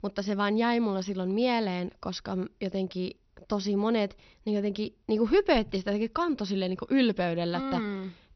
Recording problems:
high frequencies cut off; noticeable; nothing above 6 kHz

